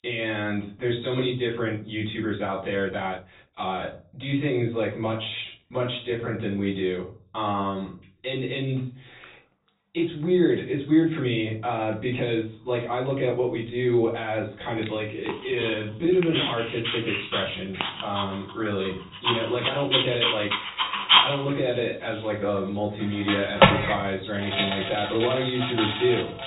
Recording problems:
off-mic speech; far
high frequencies cut off; severe; nothing above 4 kHz
room echo; slight; dies away in 0.4 s
animal sounds; very loud; throughout; 2 dB above the speech
uneven, jittery; strongly; from 3 to 21 s

